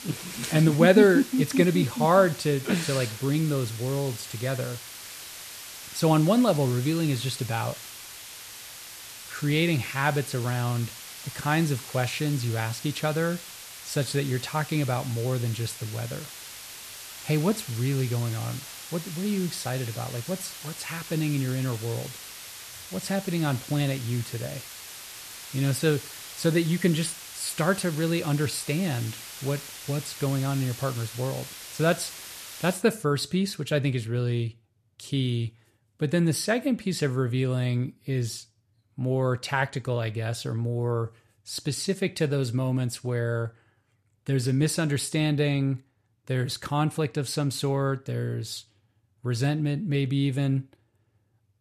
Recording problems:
hiss; noticeable; until 33 s; 10 dB below the speech

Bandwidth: 14 kHz